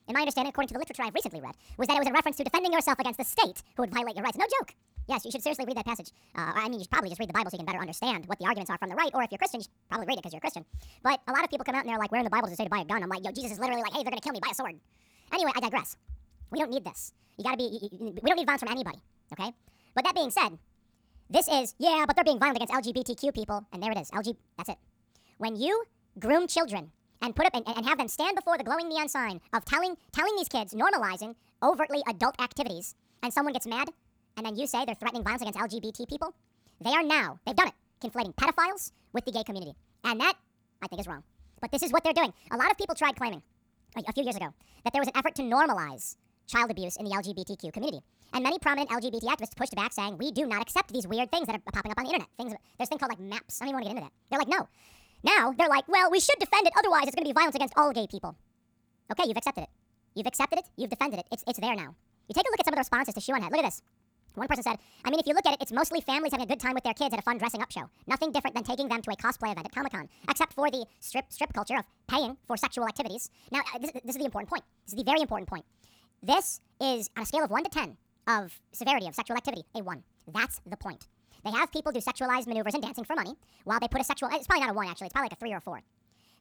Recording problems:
wrong speed and pitch; too fast and too high; 1.5 times normal speed

